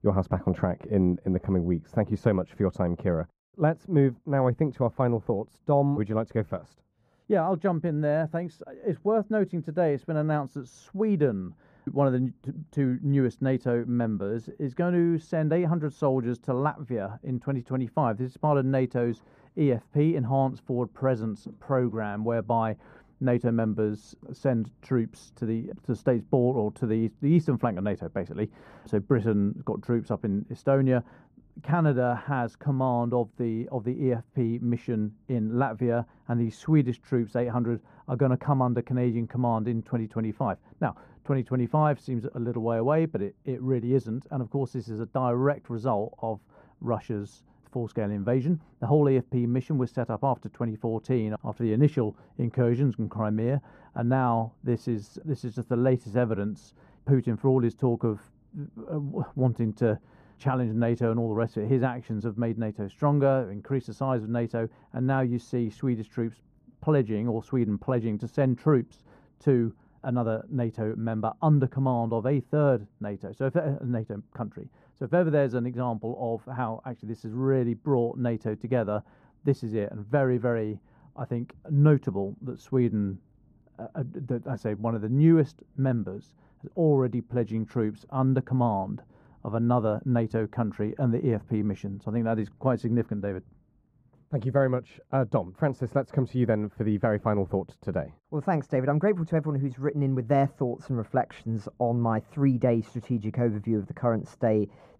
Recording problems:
muffled; very; fading above 2 kHz

